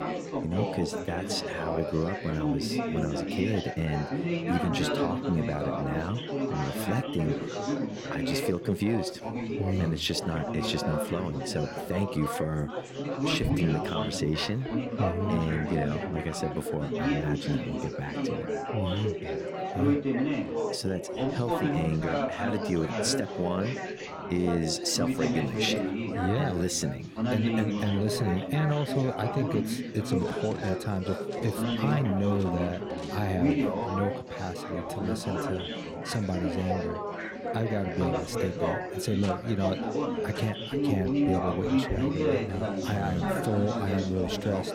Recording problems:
chatter from many people; loud; throughout; as loud as the speech
household noises; faint; throughout; 25 dB below the speech

